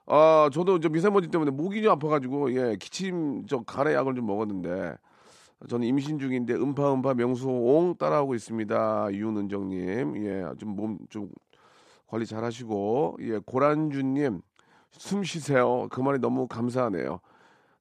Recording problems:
none

